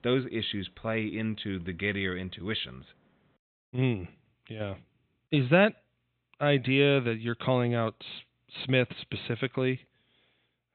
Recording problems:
high frequencies cut off; severe; nothing above 4 kHz

